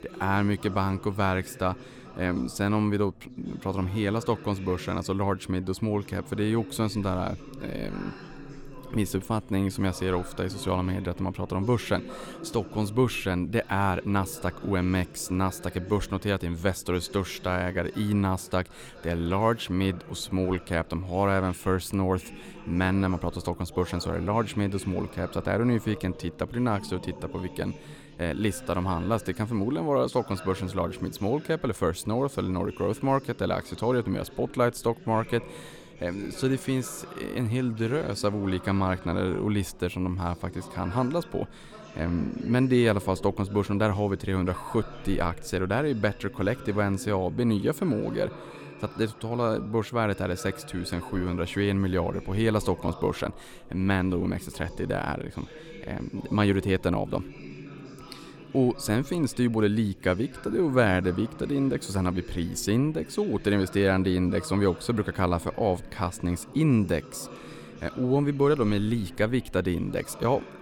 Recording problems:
chatter from many people; noticeable; throughout; 15 dB below the speech

